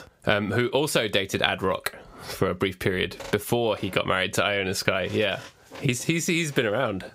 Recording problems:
squashed, flat; somewhat

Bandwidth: 15.5 kHz